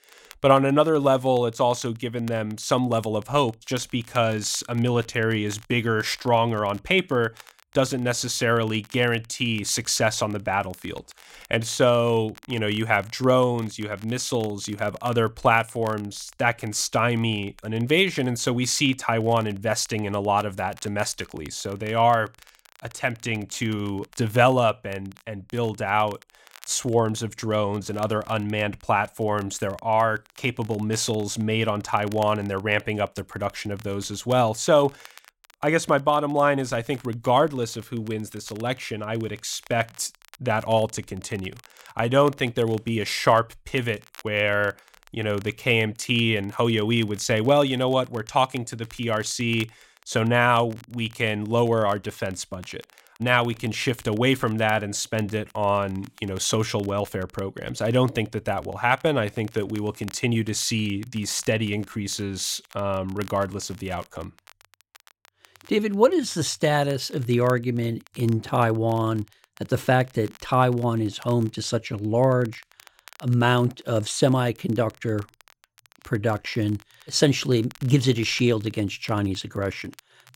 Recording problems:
crackle, like an old record; faint; 25 dB below the speech

